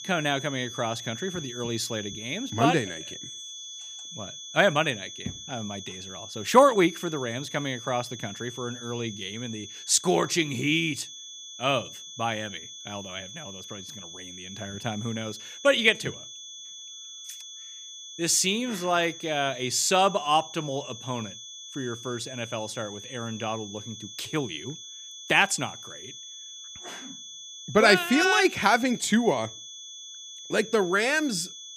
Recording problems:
high-pitched whine; noticeable; throughout; 3.5 kHz, 15 dB below the speech

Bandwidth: 15 kHz